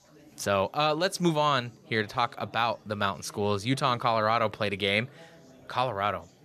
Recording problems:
chatter from many people; faint; throughout; 25 dB below the speech

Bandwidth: 14 kHz